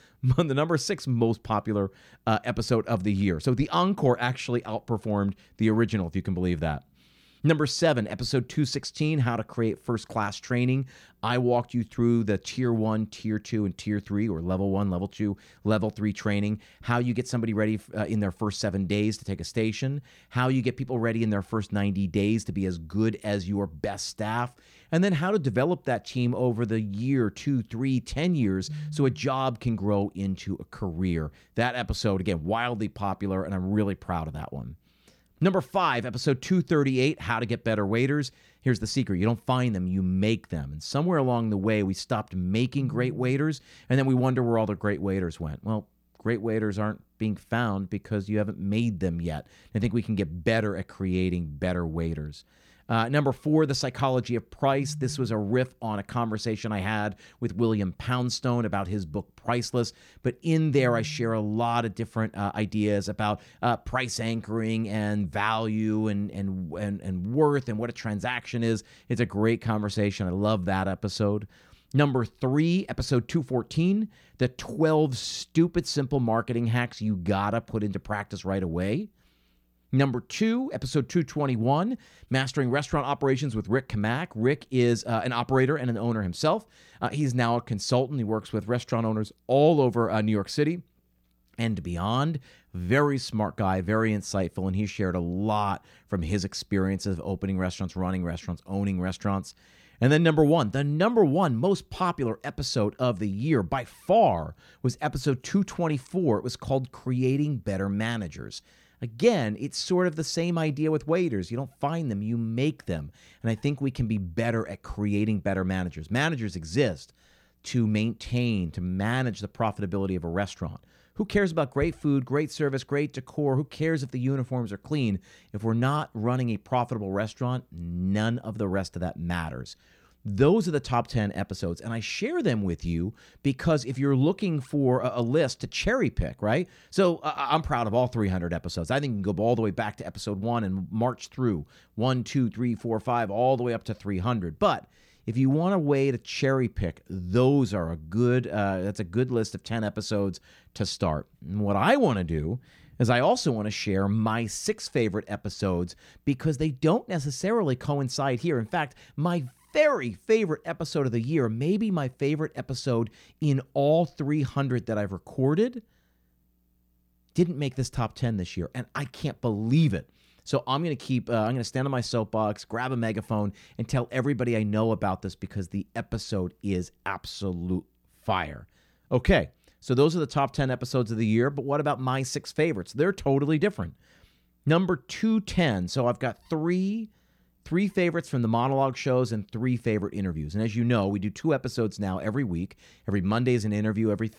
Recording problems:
none

